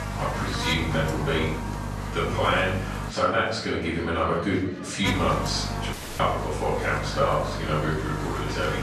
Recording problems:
off-mic speech; far
room echo; noticeable; dies away in 0.6 s
electrical hum; loud; until 3 s and from 5 s on; 50 Hz, 8 dB below the speech
murmuring crowd; noticeable; throughout; 15 dB below the speech
audio cutting out; at 6 s

